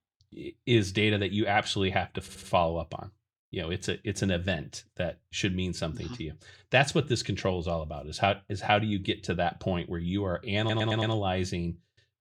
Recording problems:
audio stuttering; at 2 s and at 11 s

